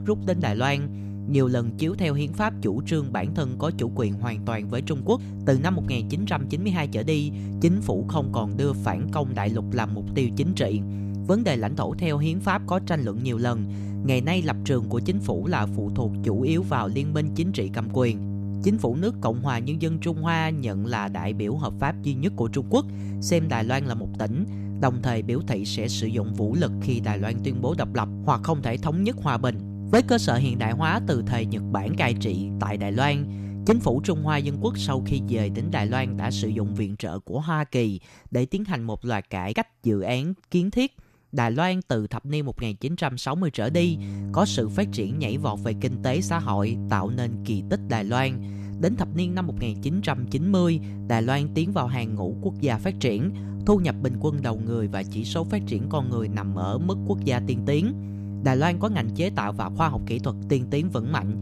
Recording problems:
electrical hum; noticeable; until 37 s and from 44 s on; 50 Hz, 10 dB below the speech

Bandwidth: 14 kHz